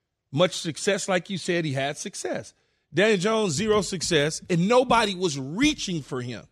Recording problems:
none

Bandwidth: 14.5 kHz